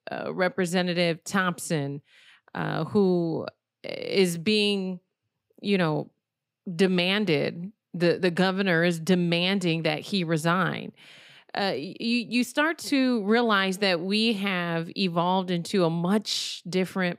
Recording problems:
none

